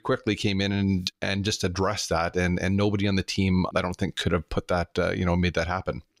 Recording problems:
none

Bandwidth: 15.5 kHz